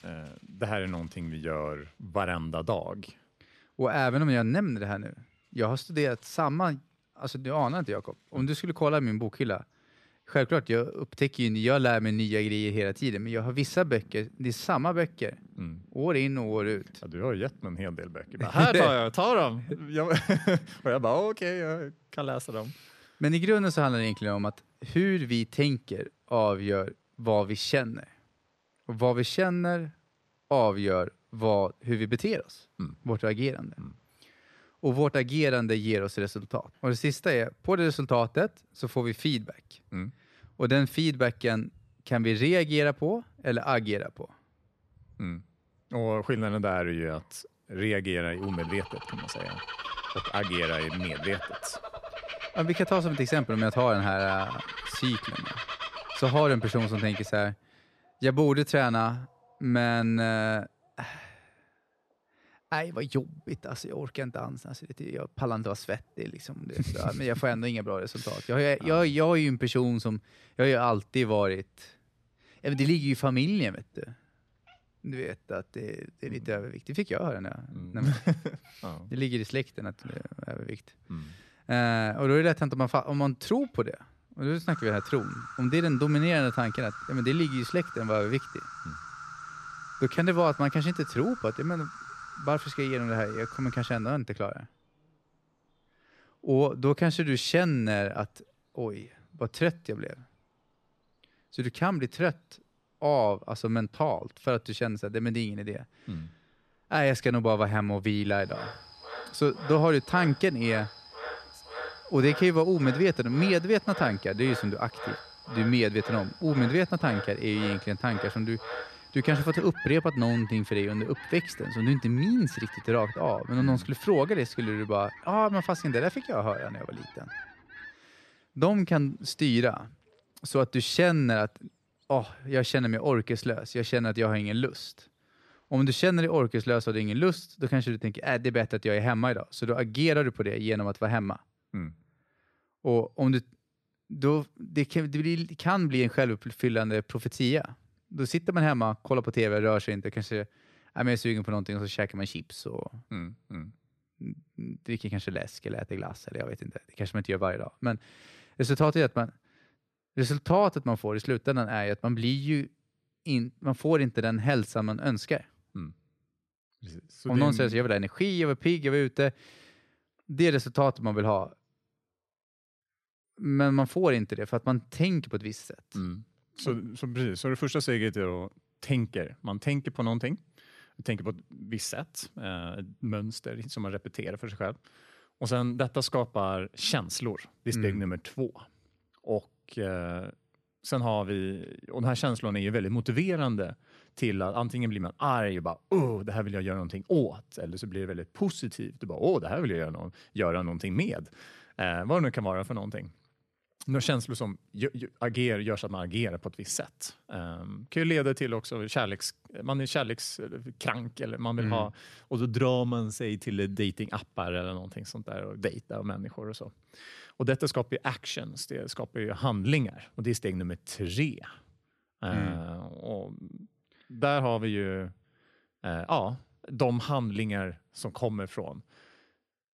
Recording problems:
animal sounds; noticeable; until 2:16; 10 dB below the speech

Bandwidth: 13.5 kHz